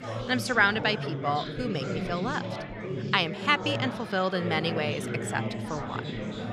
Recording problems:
chatter from many people; loud; throughout; 6 dB below the speech

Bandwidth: 15 kHz